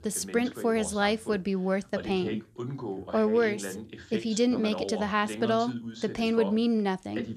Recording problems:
voice in the background; noticeable; throughout; 10 dB below the speech

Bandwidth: 14.5 kHz